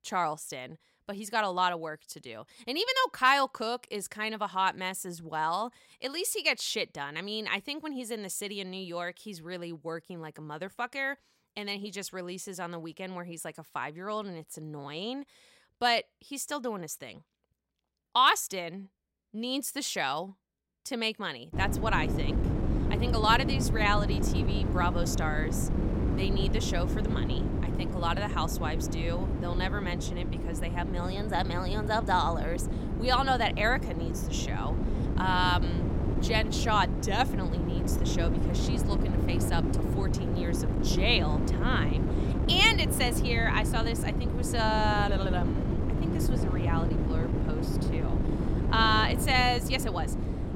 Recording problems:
wind noise on the microphone; heavy; from 22 s on; 8 dB below the speech

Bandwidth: 16 kHz